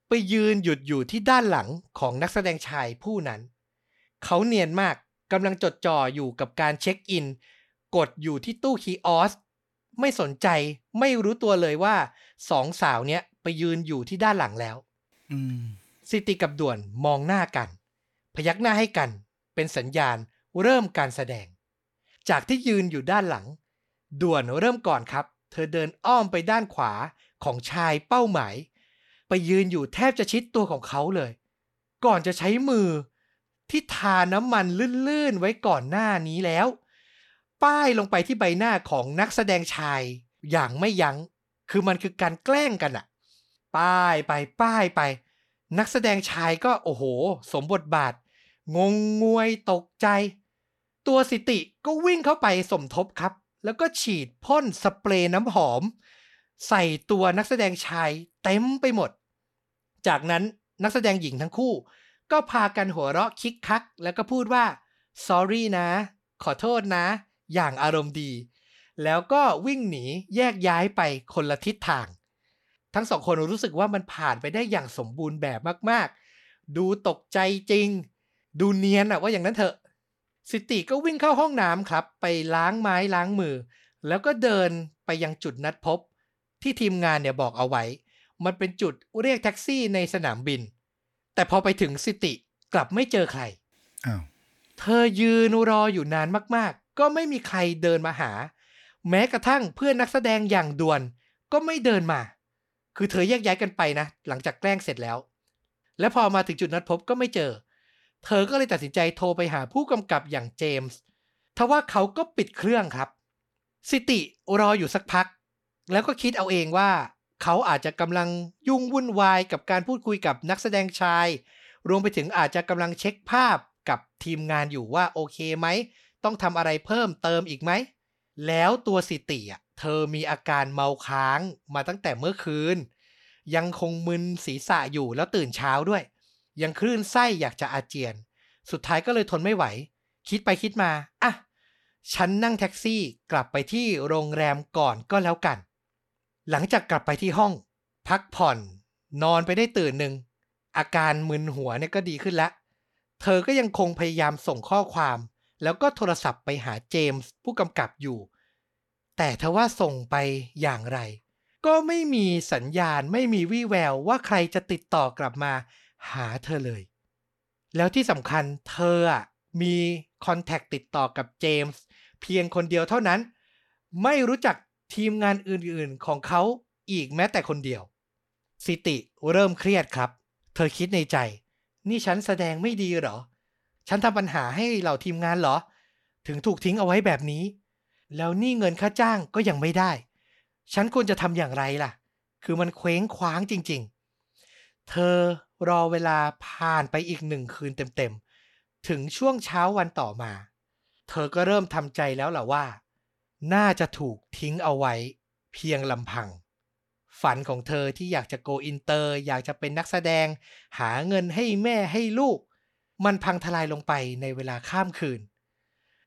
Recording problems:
none

